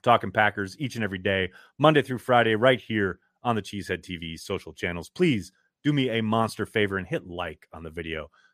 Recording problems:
none

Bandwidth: 14.5 kHz